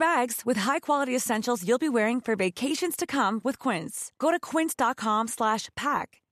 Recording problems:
abrupt cut into speech; at the start

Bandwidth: 14 kHz